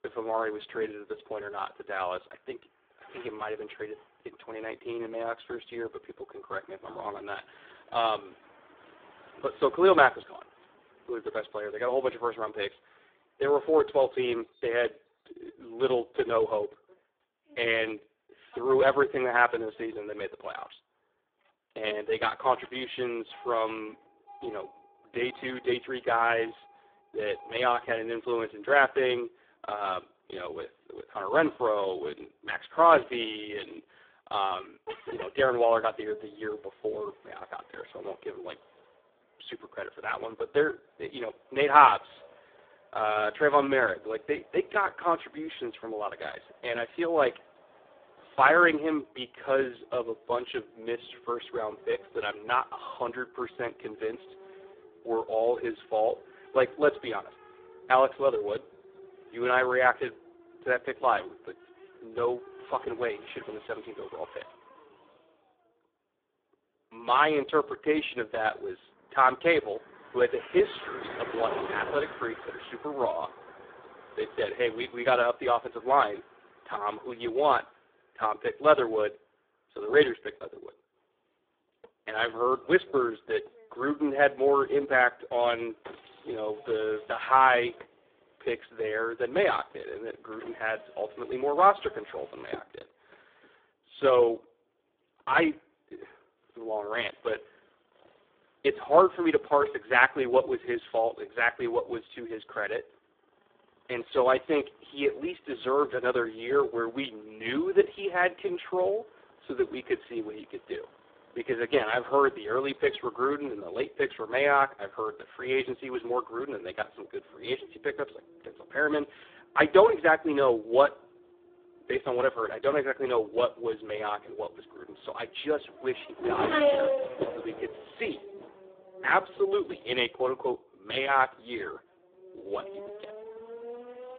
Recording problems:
phone-call audio; poor line
traffic noise; noticeable; throughout; 15 dB below the speech

